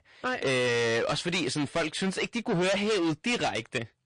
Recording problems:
distortion; heavy; 22% of the sound clipped
garbled, watery; slightly; nothing above 9 kHz

